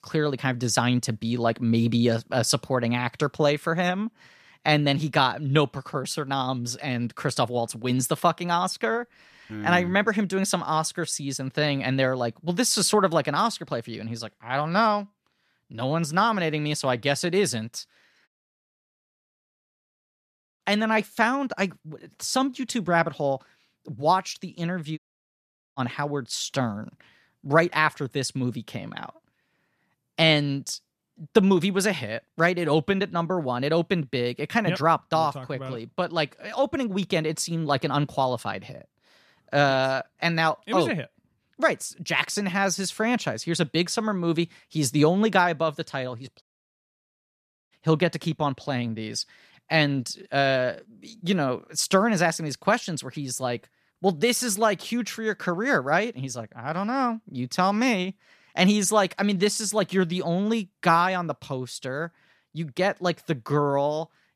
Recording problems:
audio cutting out; at 18 s for 2.5 s, at 25 s for 1 s and at 46 s for 1.5 s

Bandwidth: 14.5 kHz